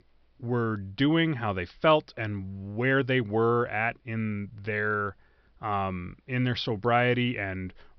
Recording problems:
high frequencies cut off; noticeable; nothing above 5.5 kHz

